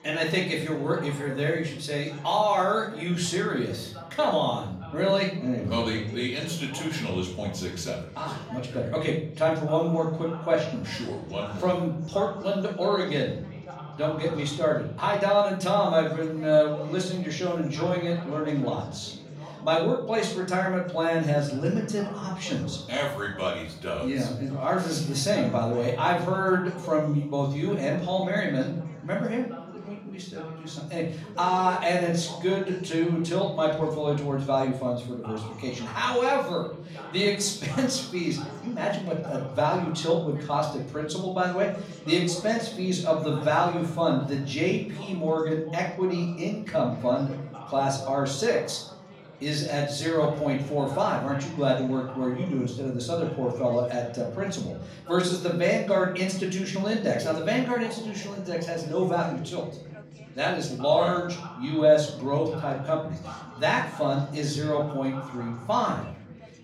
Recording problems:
off-mic speech; far
room echo; slight; dies away in 0.5 s
background chatter; noticeable; throughout; 4 voices, 15 dB below the speech

